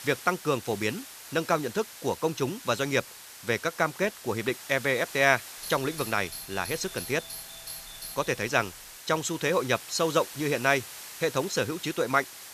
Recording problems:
hiss; noticeable; throughout; 15 dB below the speech
doorbell; faint; from 5.5 to 9 s; peak 10 dB below the speech

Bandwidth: 14.5 kHz